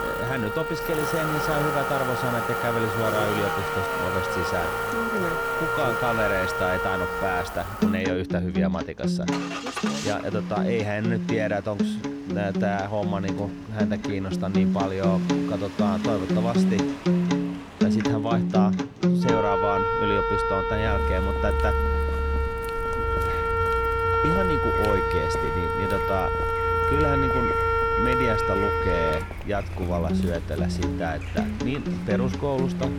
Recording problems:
background music; very loud; throughout; 3 dB above the speech
traffic noise; loud; throughout; 3 dB below the speech

